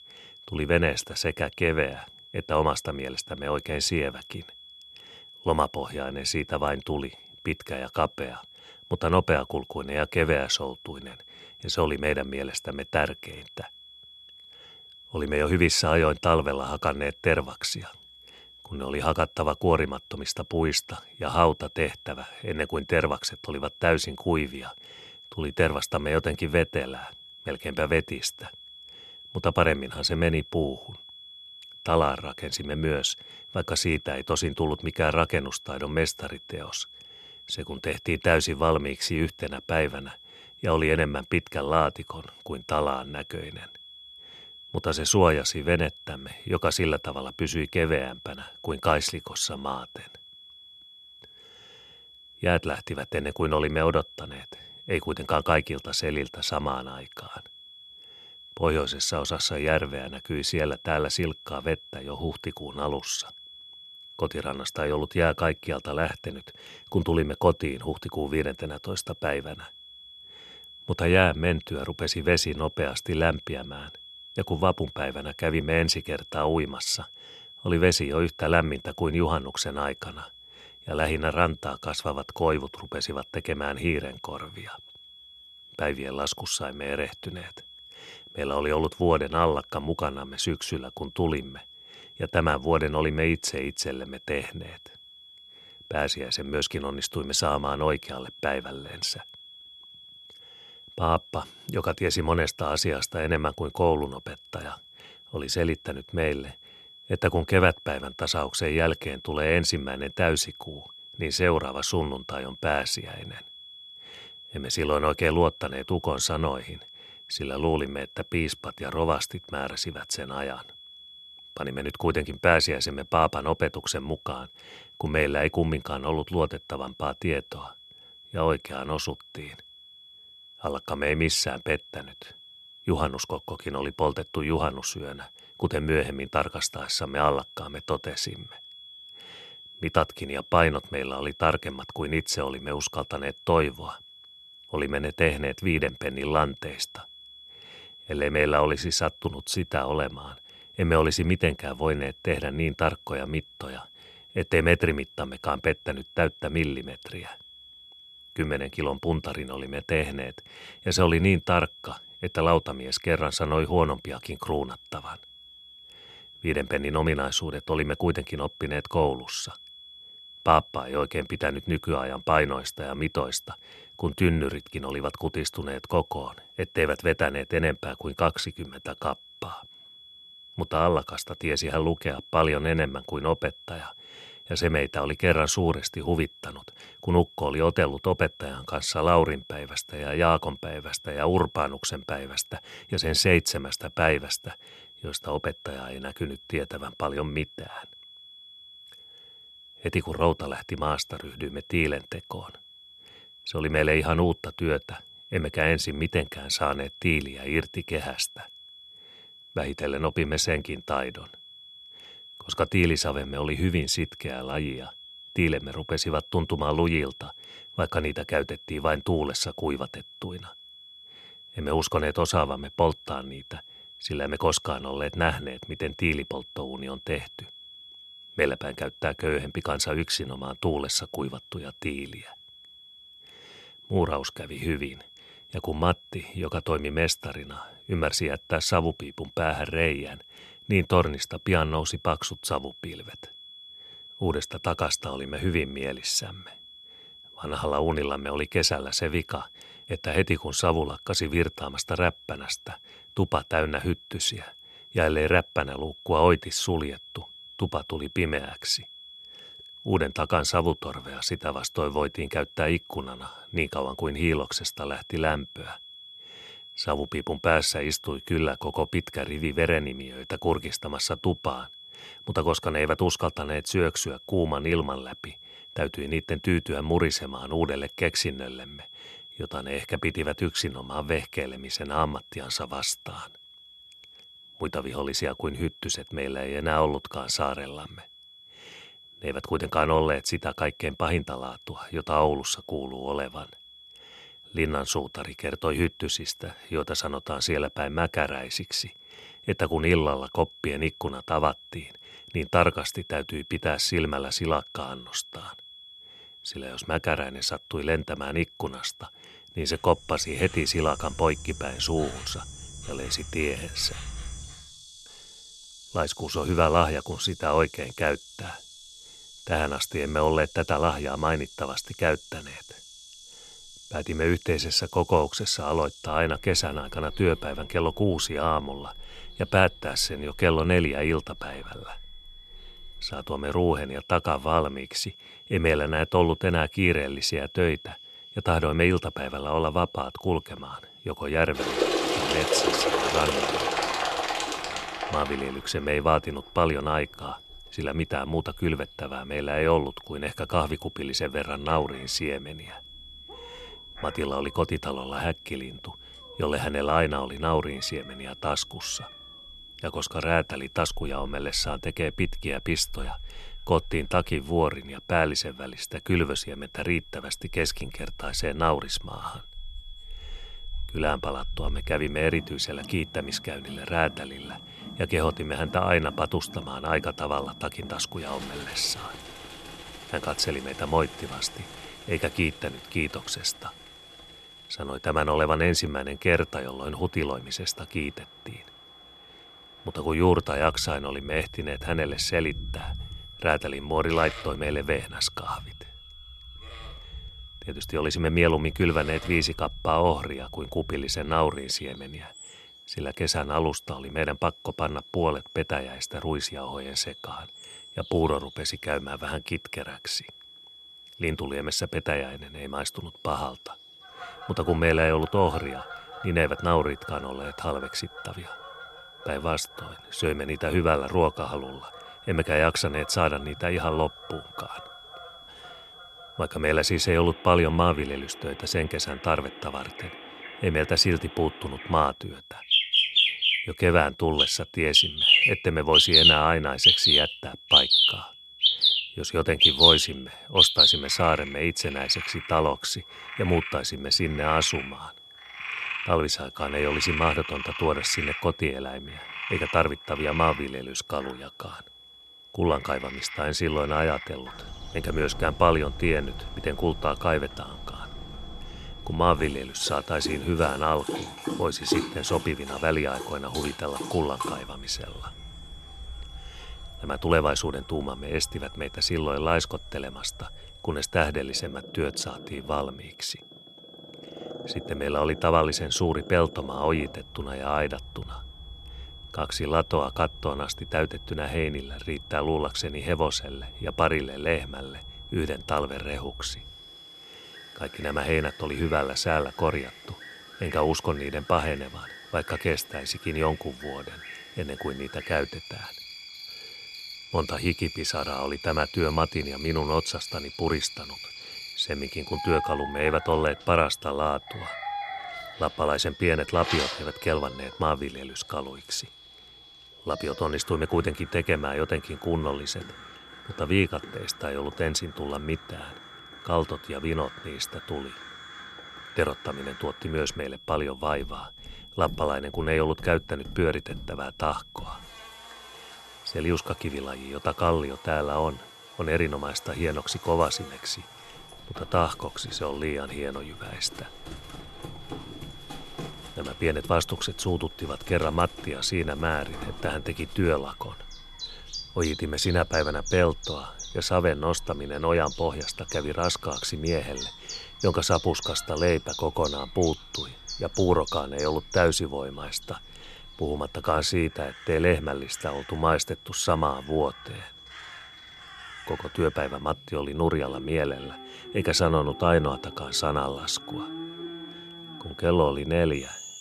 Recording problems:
animal sounds; loud; from 5:10 on; 1 dB below the speech
high-pitched whine; noticeable; throughout; 3.5 kHz, 20 dB below the speech

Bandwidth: 13.5 kHz